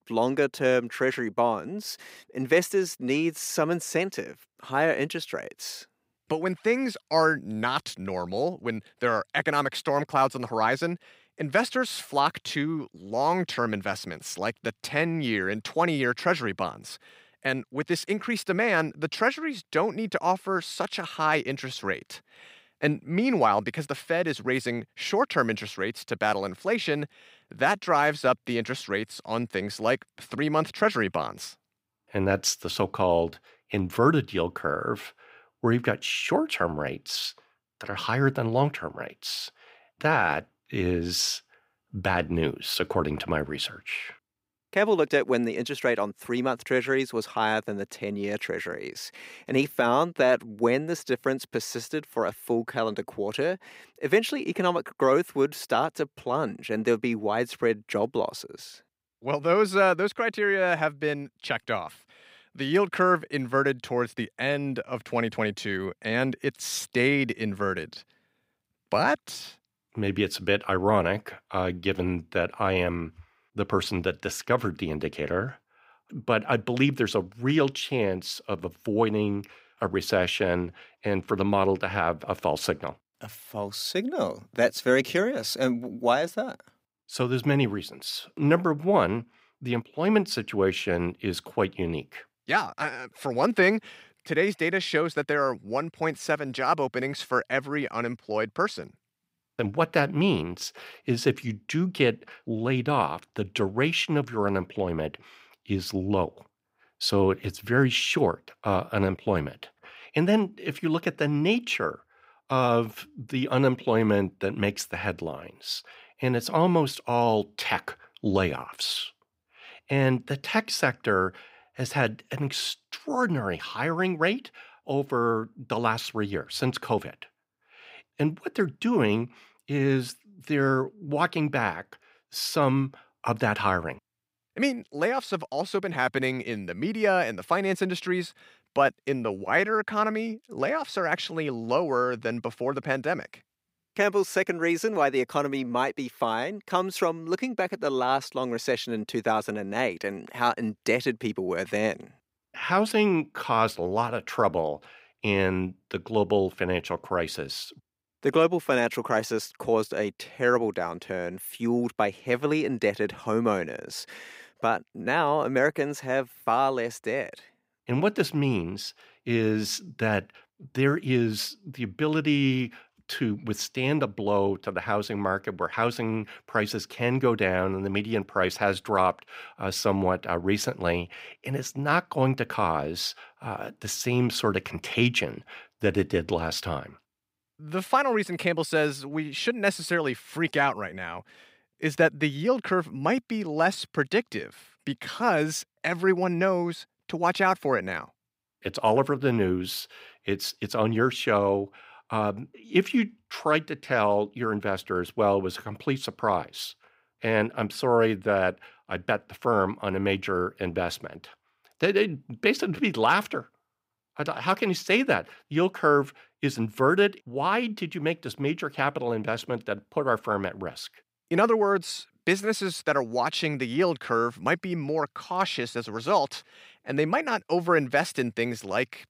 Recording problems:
none

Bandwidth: 15.5 kHz